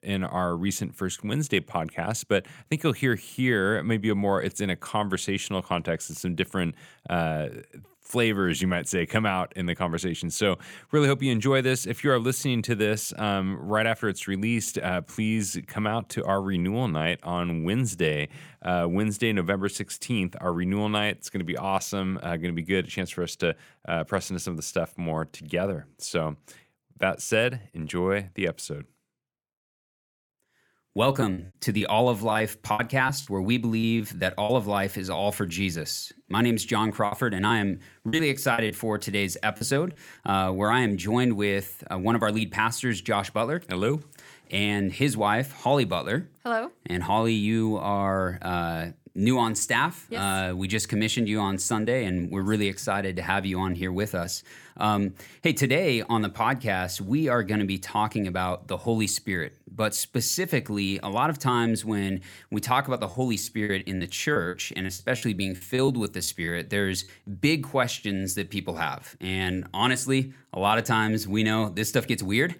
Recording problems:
choppy; very; from 31 to 34 s, from 37 to 40 s and from 1:03 to 1:06; 11% of the speech affected

